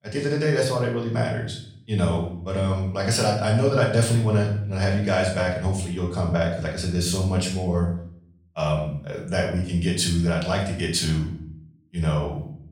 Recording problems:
off-mic speech; far
room echo; noticeable; dies away in 0.5 s

